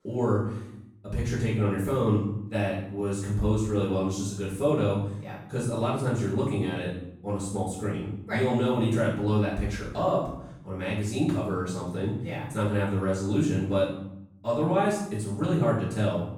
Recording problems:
off-mic speech; far
room echo; noticeable; dies away in 0.7 s

